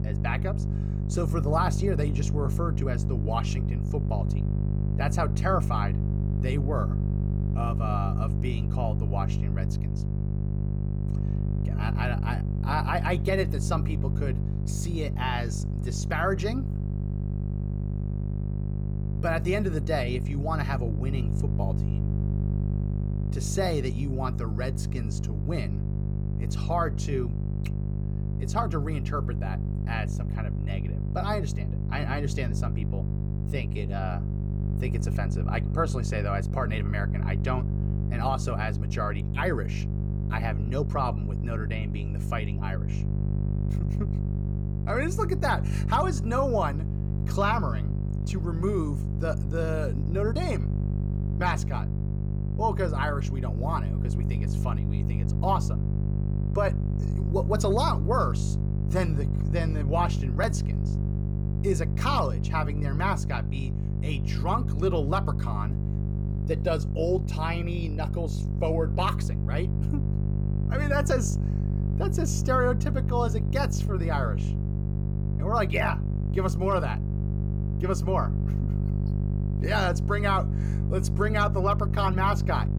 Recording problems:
electrical hum; loud; throughout; 50 Hz, 10 dB below the speech

